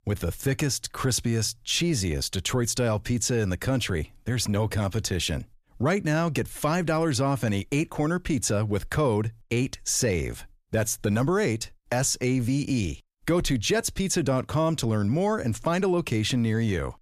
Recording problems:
none

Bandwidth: 14.5 kHz